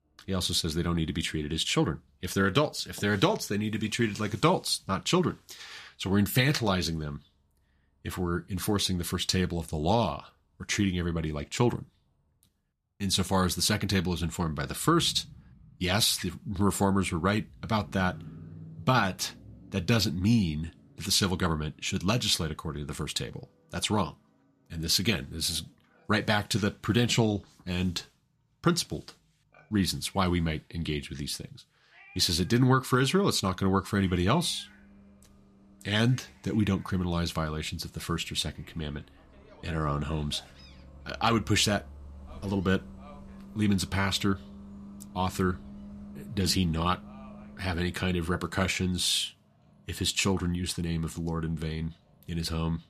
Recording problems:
traffic noise; faint; throughout; 20 dB below the speech
animal sounds; faint; from 22 s on; 30 dB below the speech

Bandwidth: 14.5 kHz